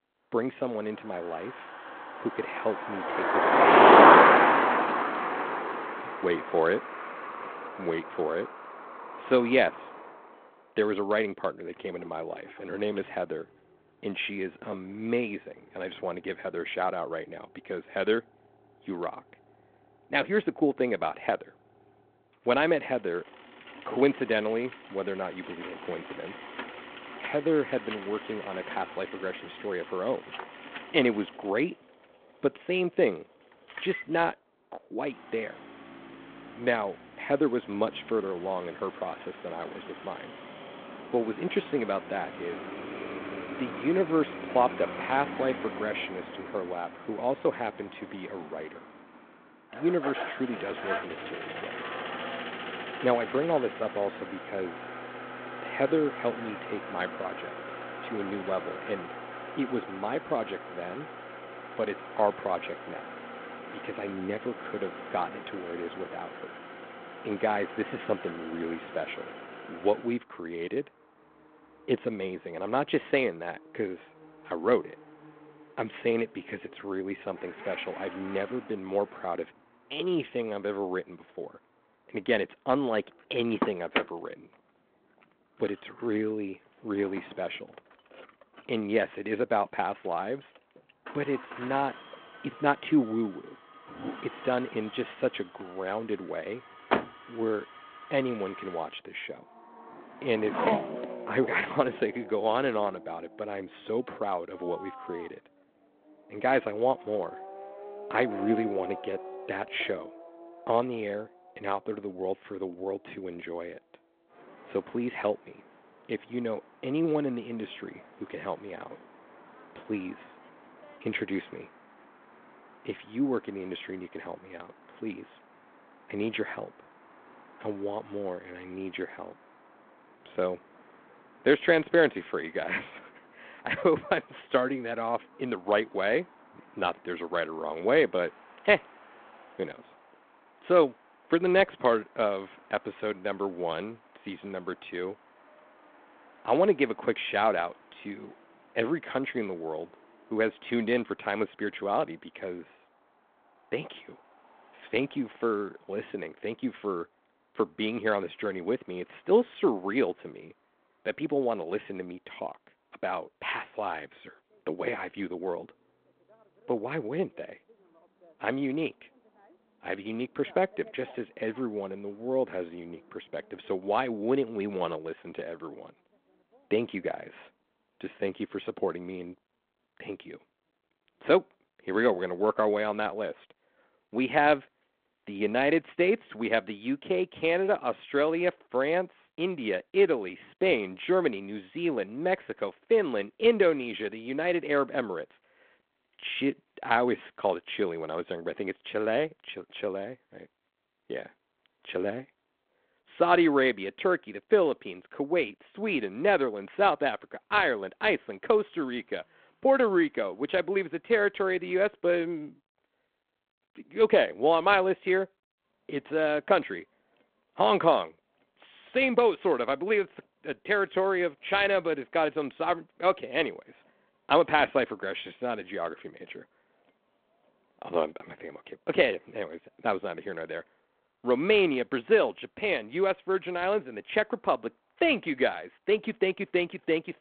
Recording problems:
phone-call audio; nothing above 3.5 kHz
traffic noise; loud; throughout; 1 dB below the speech

